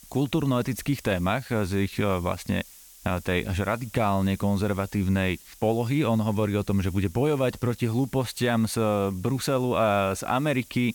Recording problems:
hiss; faint; throughout; 20 dB below the speech

